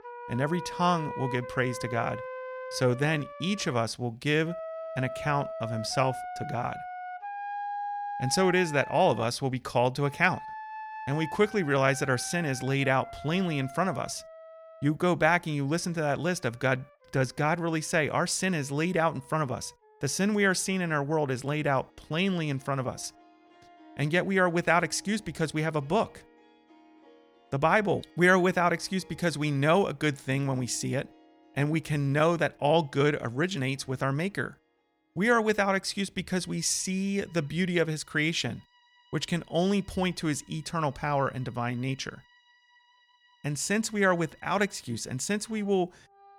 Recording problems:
background music; noticeable; throughout; 10 dB below the speech

